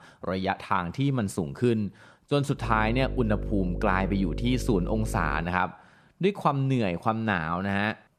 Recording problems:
electrical hum; noticeable; from 2.5 to 5.5 s; 50 Hz, 15 dB below the speech

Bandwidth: 14 kHz